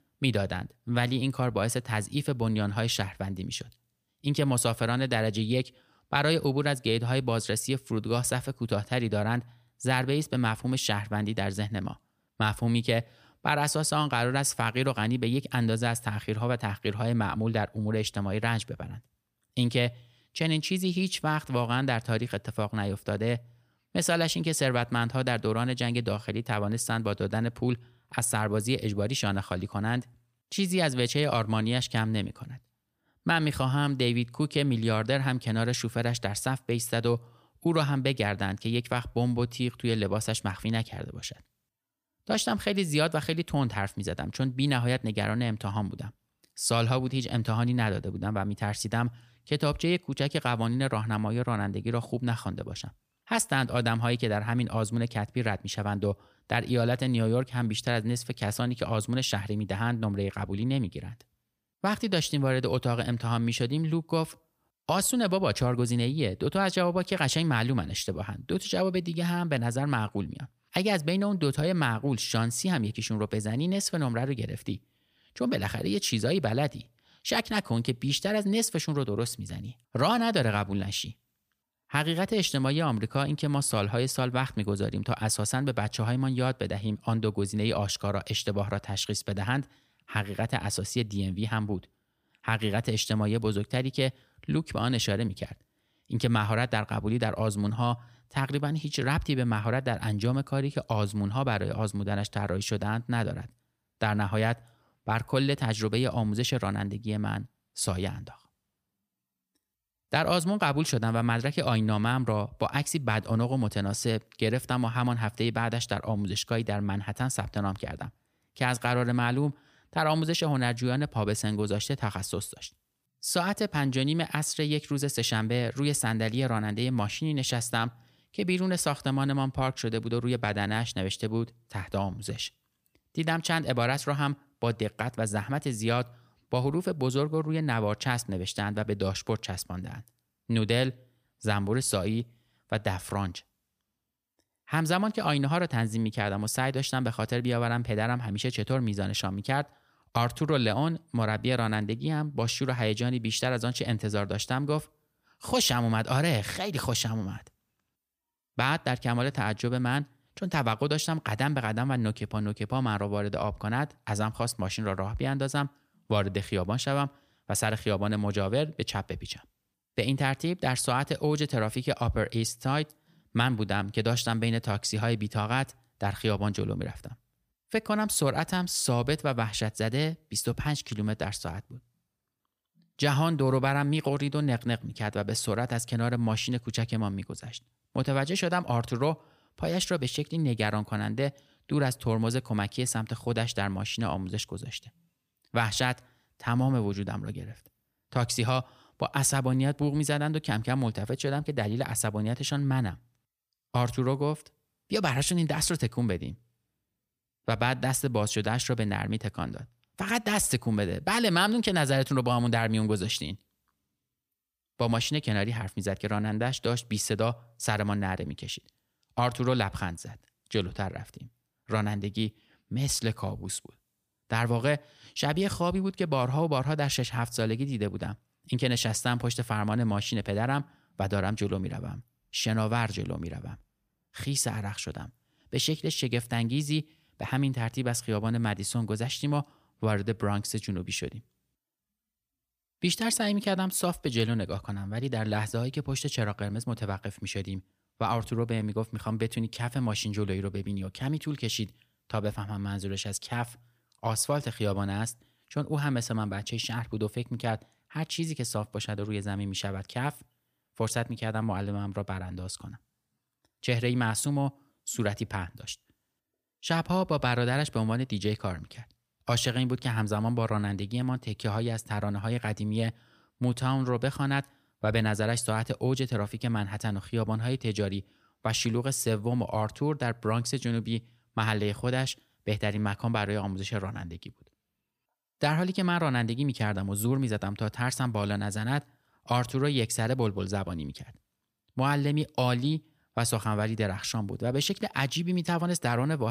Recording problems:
abrupt cut into speech; at the end

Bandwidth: 15 kHz